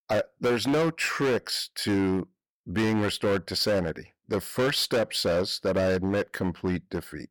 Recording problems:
distortion; heavy; 14% of the sound clipped

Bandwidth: 18 kHz